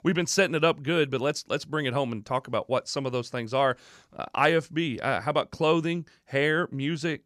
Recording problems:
none

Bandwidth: 14.5 kHz